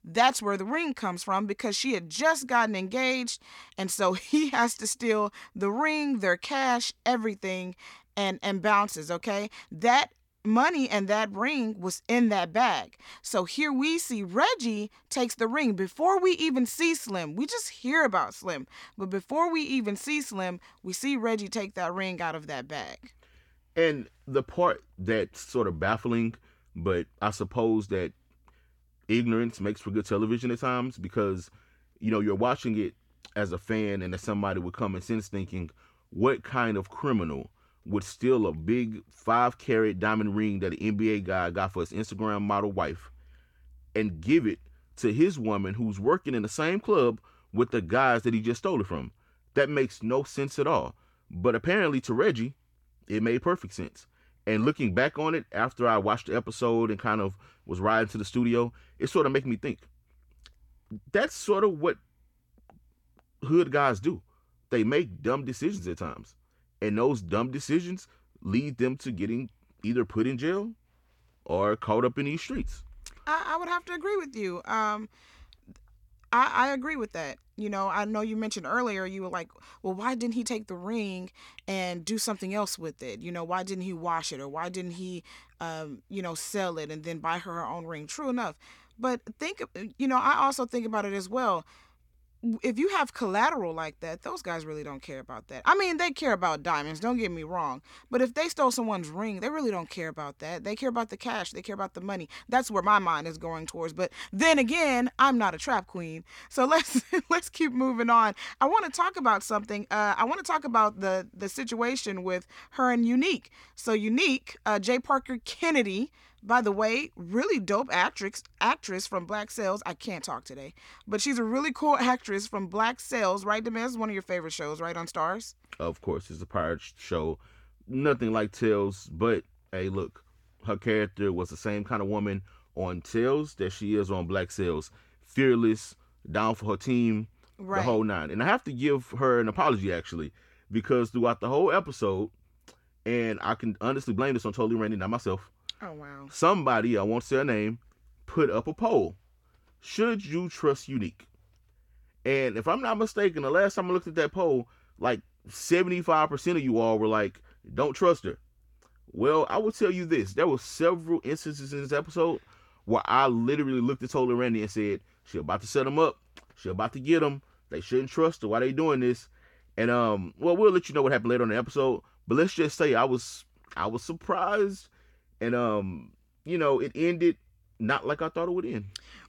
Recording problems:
none

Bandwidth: 17 kHz